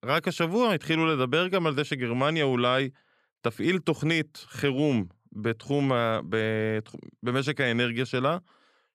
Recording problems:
none

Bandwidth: 14 kHz